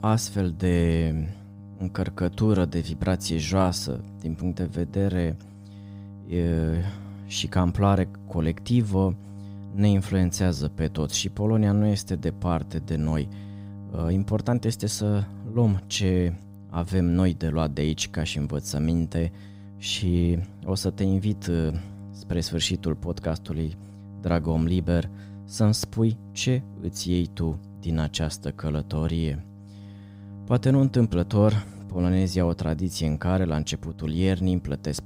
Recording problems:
electrical hum; faint; throughout; 50 Hz, 20 dB below the speech

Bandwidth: 15.5 kHz